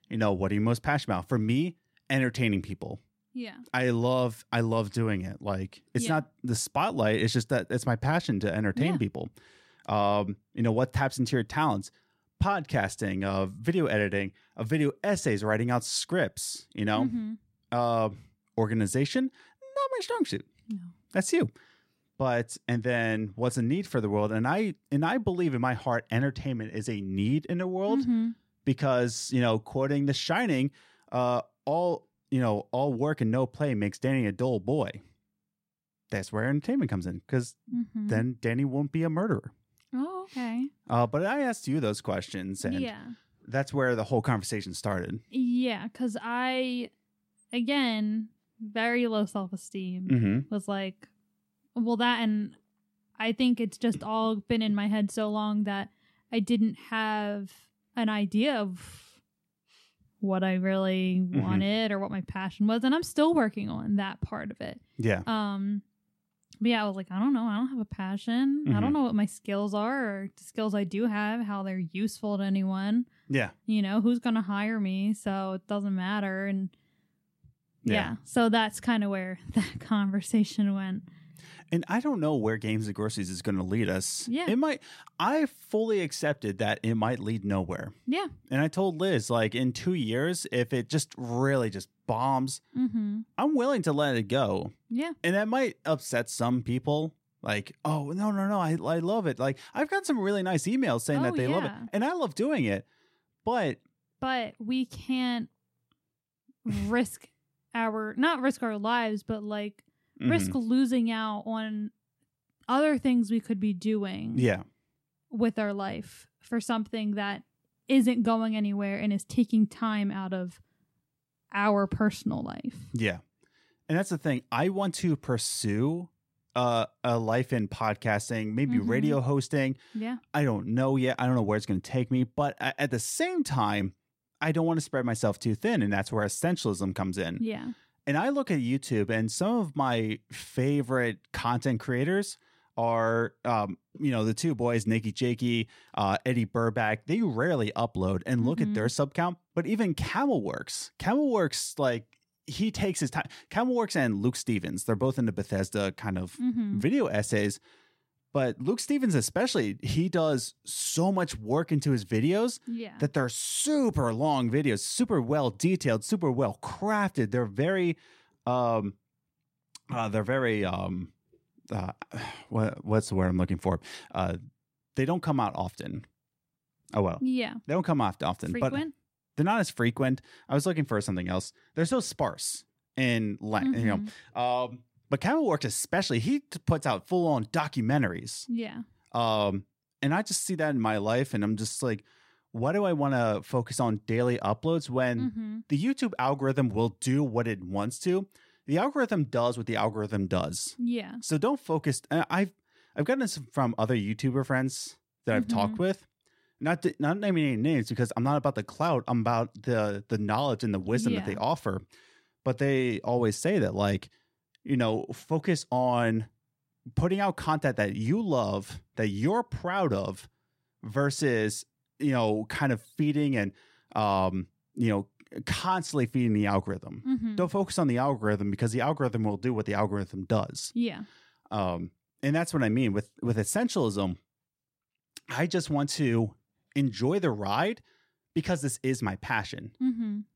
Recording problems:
none

